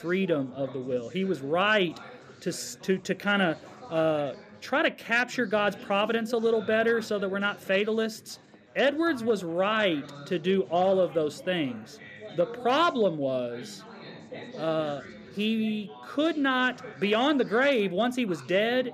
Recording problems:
chatter from many people; noticeable; throughout; 20 dB below the speech

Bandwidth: 14.5 kHz